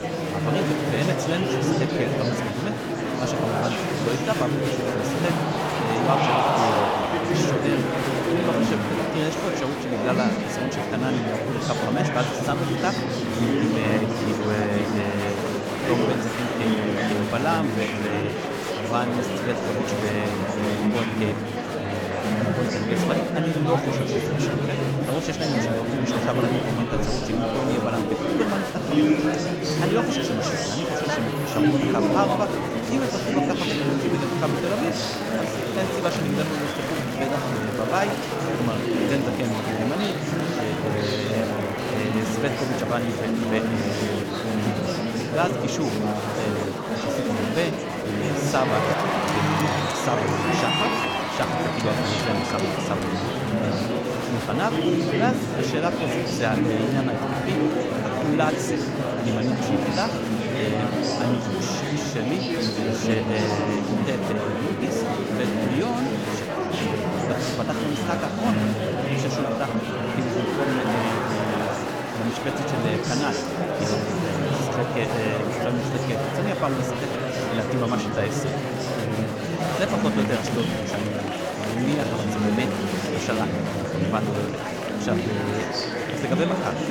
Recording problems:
murmuring crowd; very loud; throughout; 4 dB above the speech

